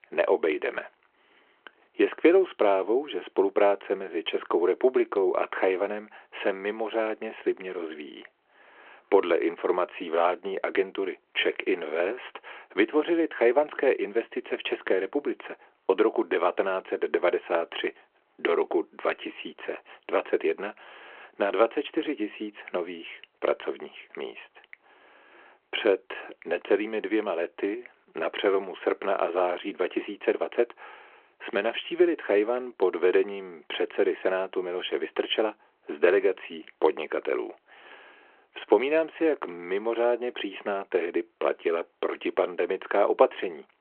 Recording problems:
phone-call audio

